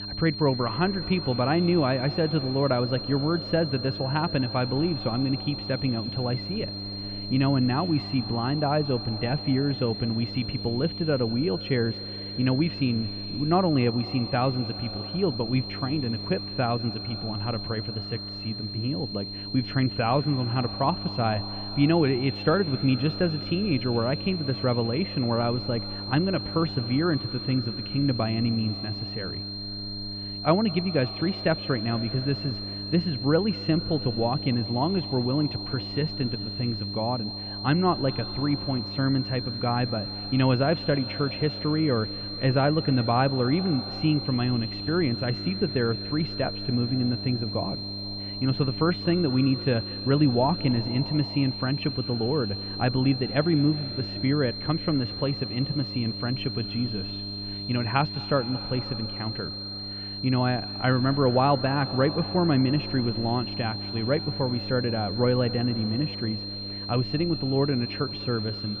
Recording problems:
muffled; very; fading above 2.5 kHz
echo of what is said; faint; throughout; 200 ms later, 20 dB below the speech
high-pitched whine; loud; throughout; 4 kHz, 7 dB below the speech
electrical hum; noticeable; throughout; 50 Hz, 15 dB below the speech

